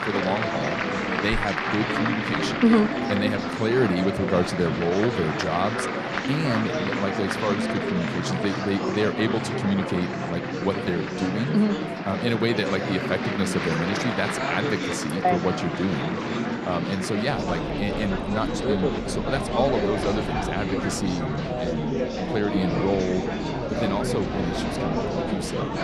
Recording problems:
murmuring crowd; loud; throughout; as loud as the speech

